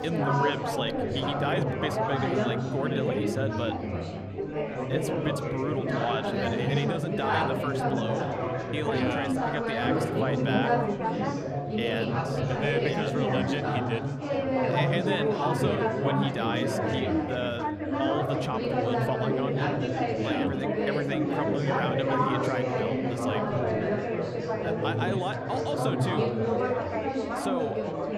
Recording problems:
chatter from many people; very loud; throughout; 4 dB above the speech

